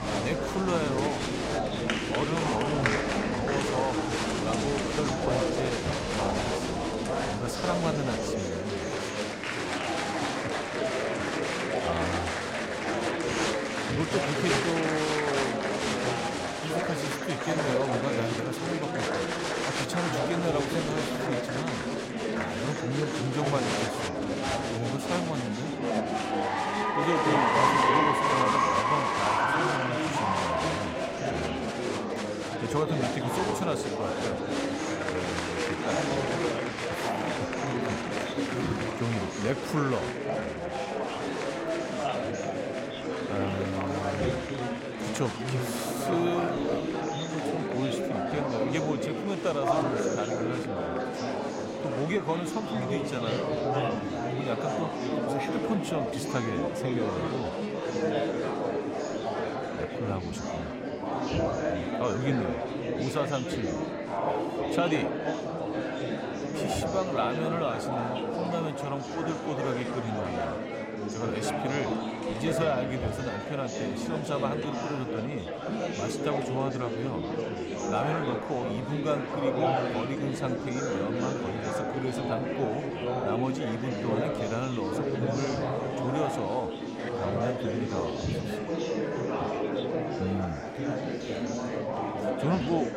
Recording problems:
murmuring crowd; very loud; throughout; 4 dB above the speech

